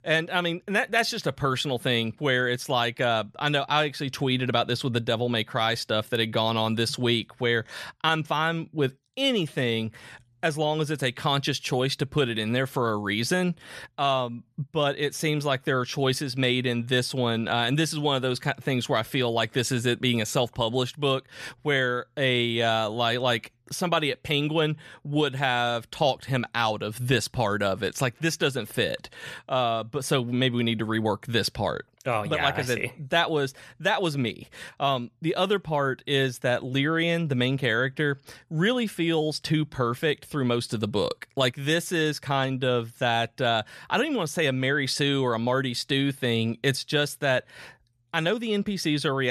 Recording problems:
abrupt cut into speech; at the end

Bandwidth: 14 kHz